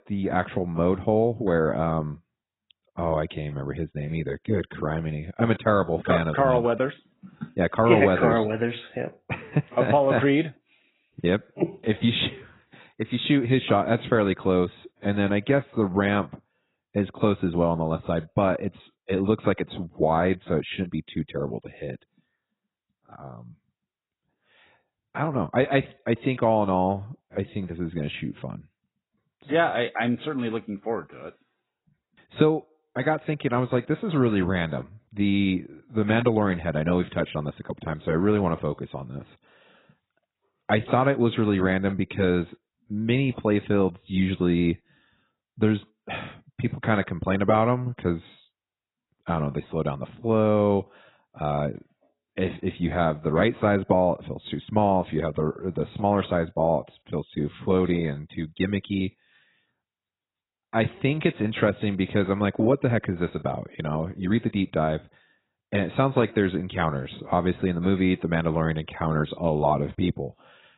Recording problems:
garbled, watery; badly; nothing above 4 kHz

